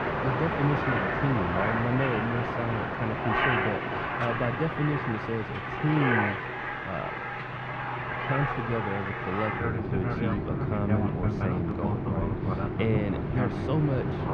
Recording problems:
muffled; slightly; fading above 2.5 kHz
train or aircraft noise; very loud; throughout; 2 dB above the speech

